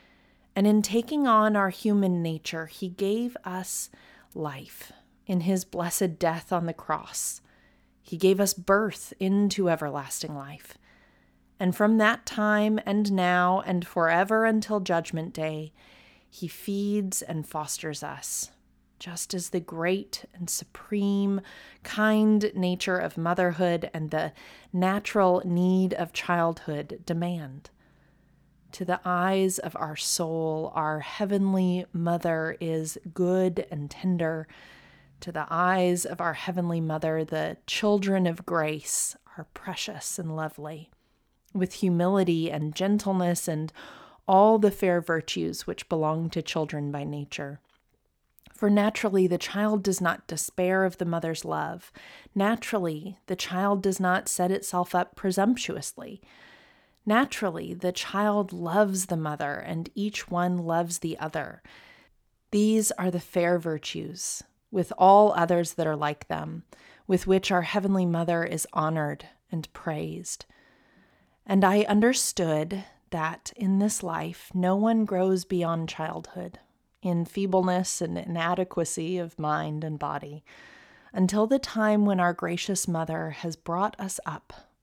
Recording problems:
none

